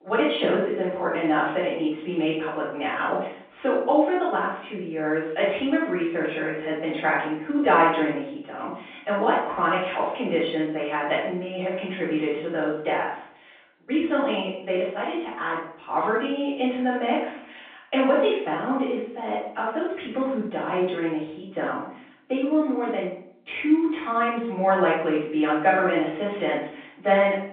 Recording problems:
off-mic speech; far
room echo; noticeable; dies away in 0.5 s
phone-call audio; nothing above 3.5 kHz

